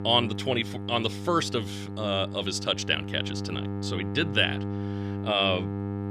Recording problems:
electrical hum; noticeable; throughout; 50 Hz, 15 dB below the speech

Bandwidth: 14.5 kHz